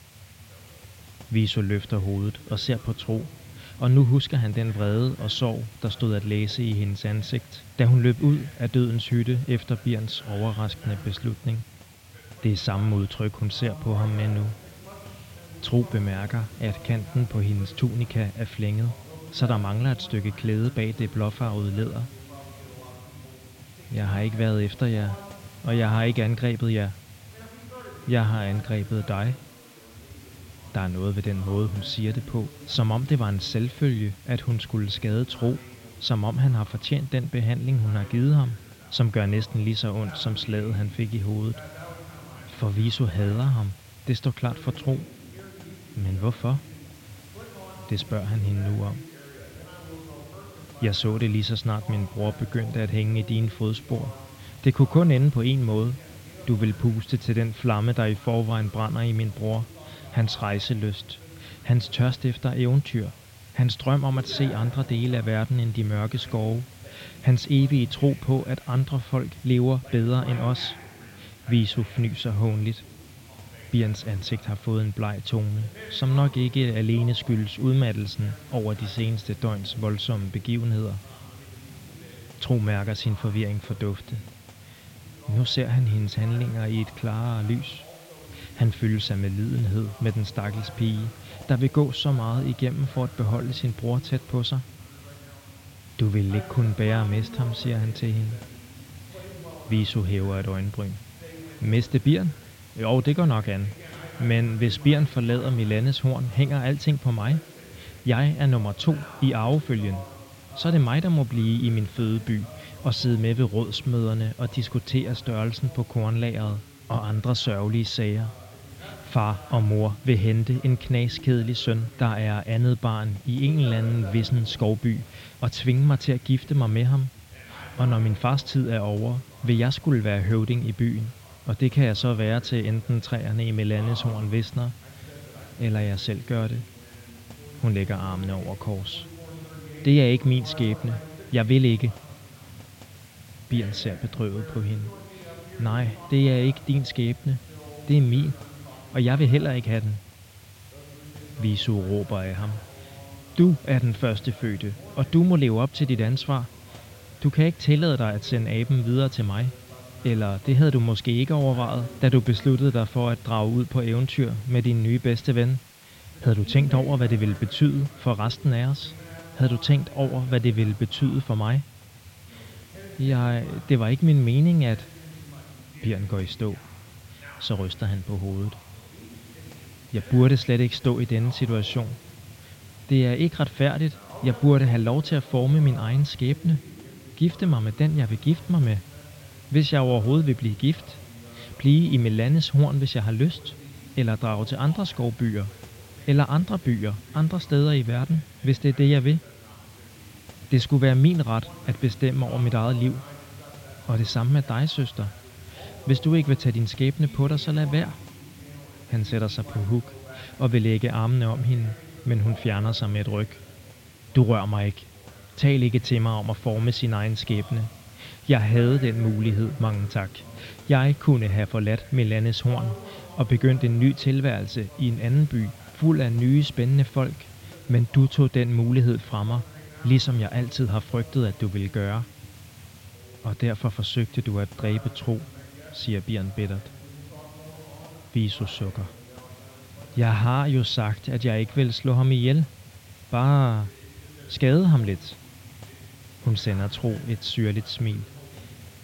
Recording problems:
muffled; very slightly; fading above 4 kHz
voice in the background; faint; throughout; 20 dB below the speech
hiss; faint; throughout; 20 dB below the speech

